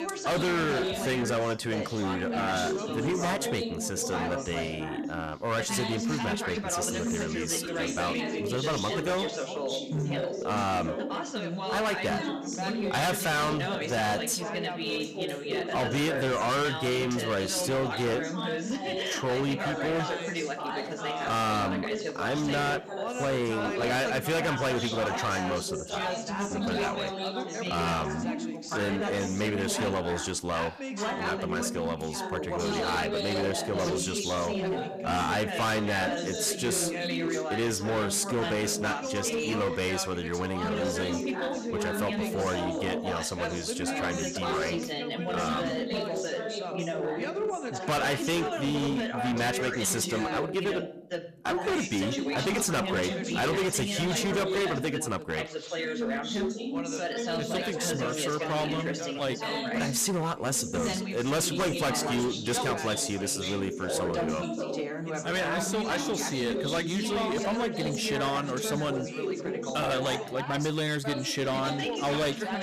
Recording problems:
distortion; heavy; 16% of the sound clipped
background chatter; loud; throughout; 3 voices, 2 dB below the speech

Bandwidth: 14.5 kHz